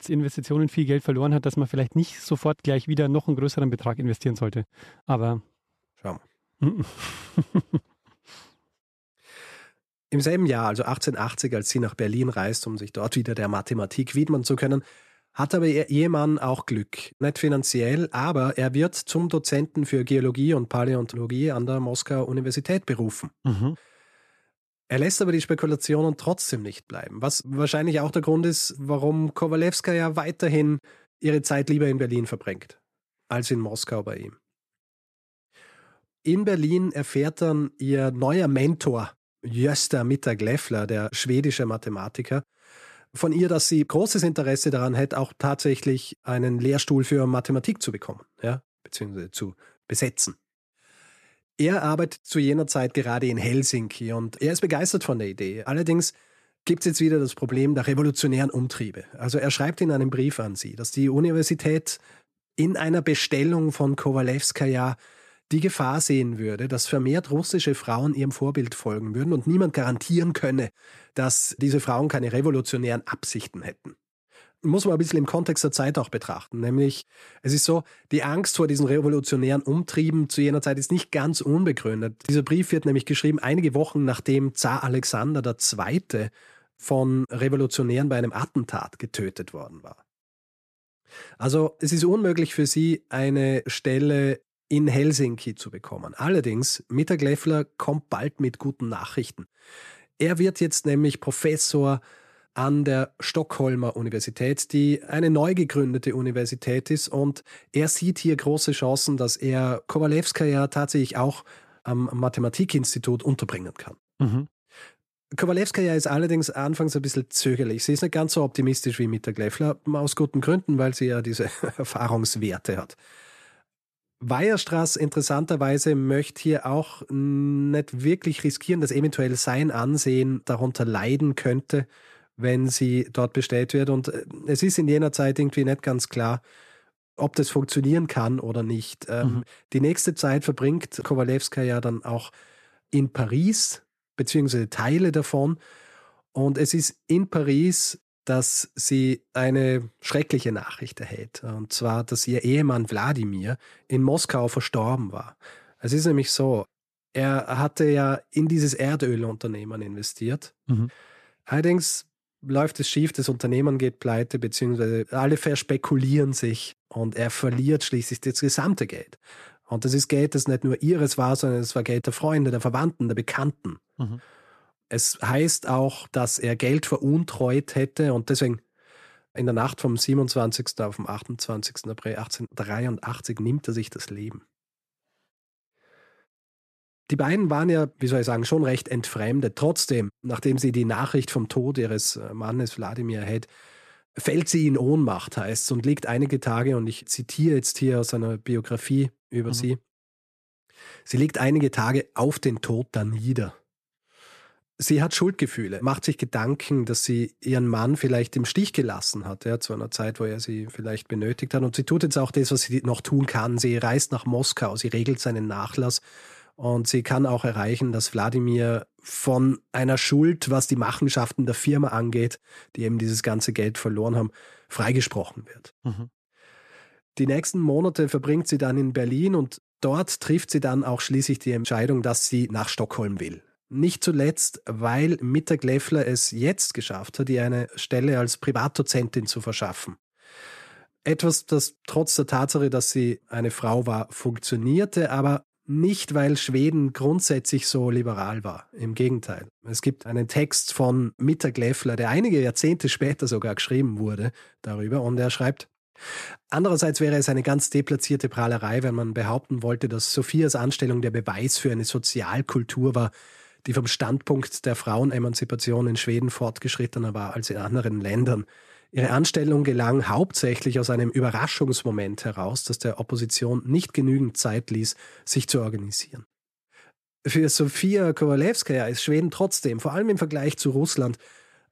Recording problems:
none

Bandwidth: 13.5 kHz